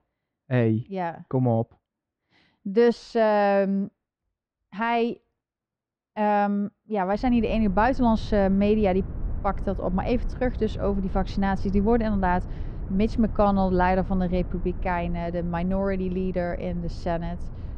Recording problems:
muffled; very; fading above 1.5 kHz
low rumble; faint; from 7 s on; 20 dB below the speech

